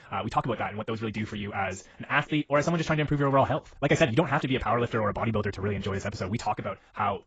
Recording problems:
garbled, watery; badly; nothing above 7.5 kHz
wrong speed, natural pitch; too fast; 1.7 times normal speed

